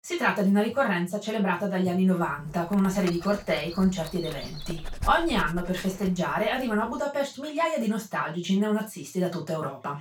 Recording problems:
off-mic speech; far
room echo; slight; dies away in 0.2 s
dog barking; noticeable; from 2.5 to 6 s; peak 10 dB below the speech

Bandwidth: 17.5 kHz